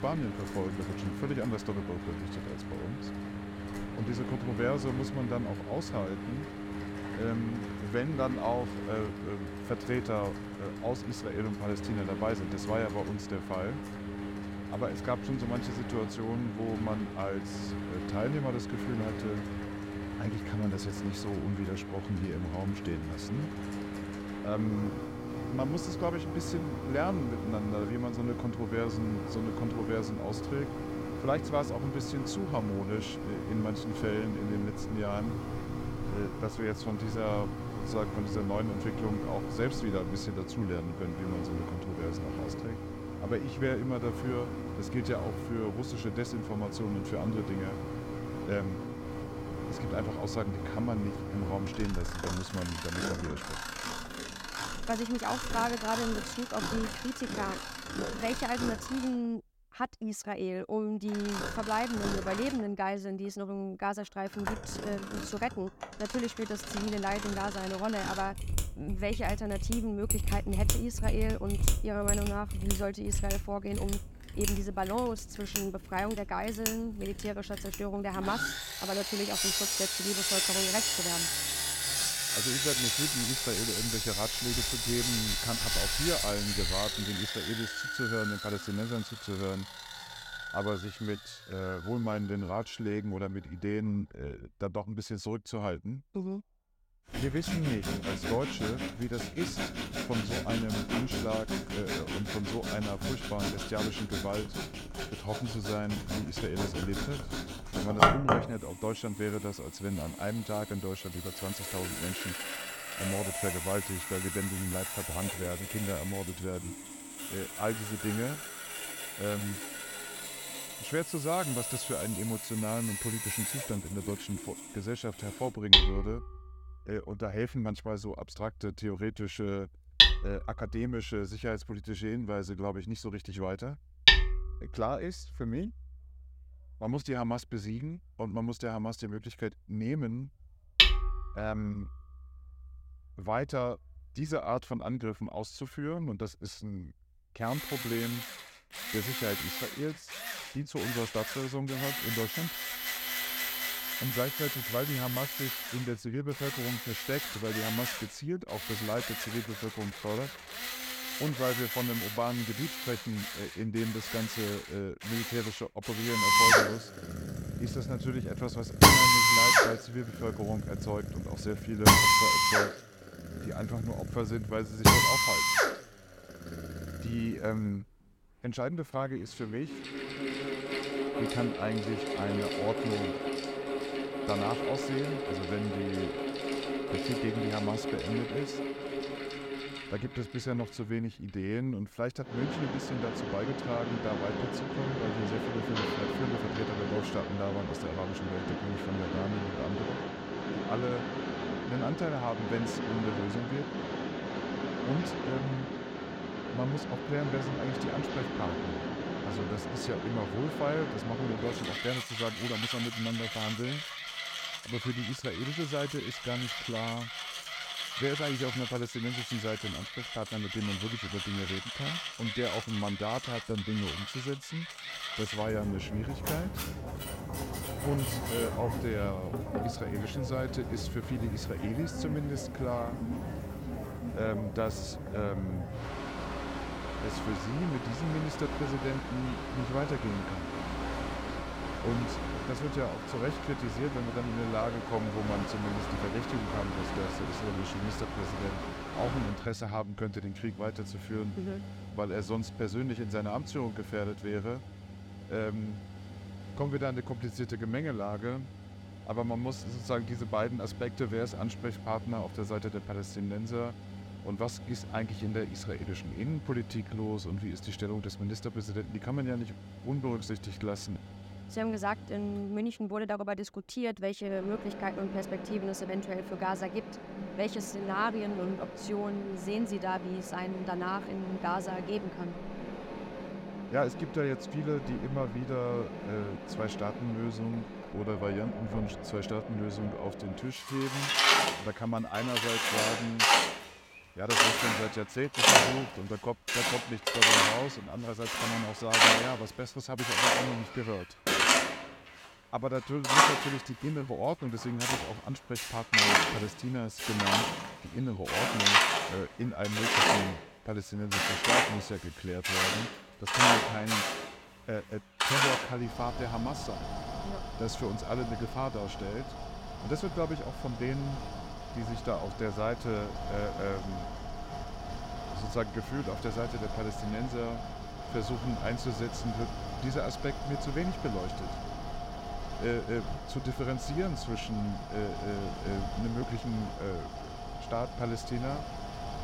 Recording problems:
machinery noise; very loud; throughout; 3 dB above the speech

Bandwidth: 16.5 kHz